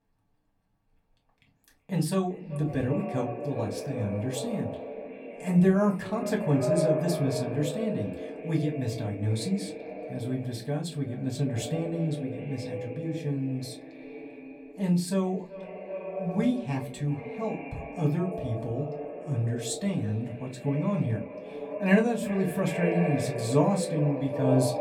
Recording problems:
echo of what is said; strong; throughout; 380 ms later, 7 dB below the speech
room echo; very slight; dies away in 0.2 s
off-mic speech; somewhat distant

